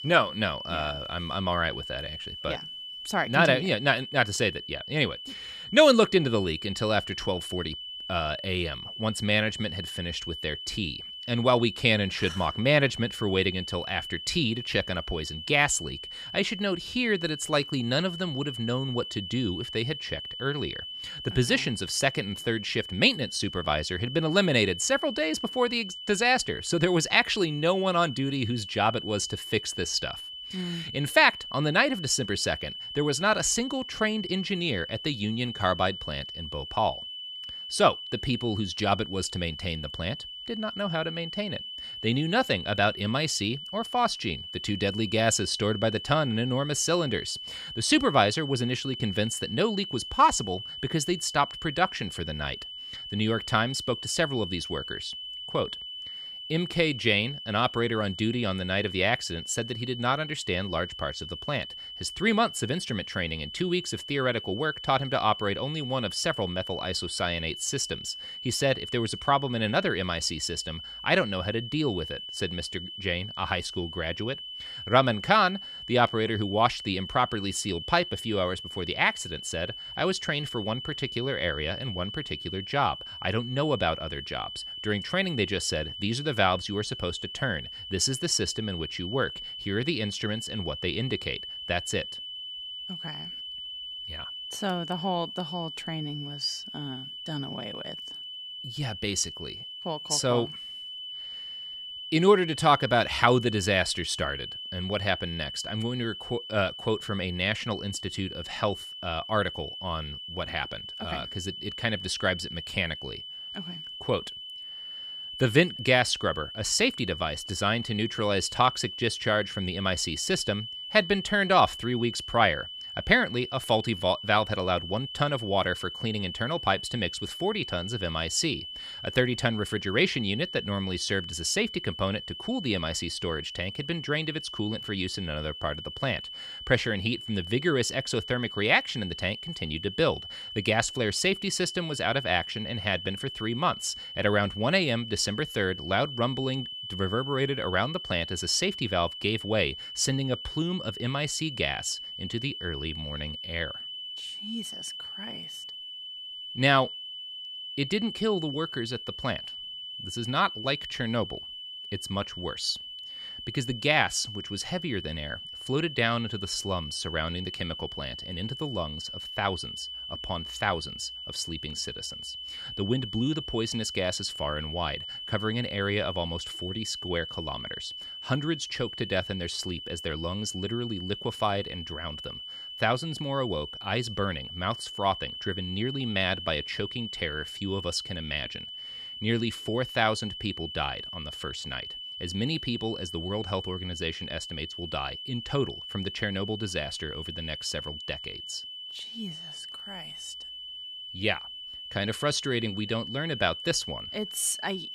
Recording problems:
high-pitched whine; loud; throughout; 3 kHz, 9 dB below the speech

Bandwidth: 14.5 kHz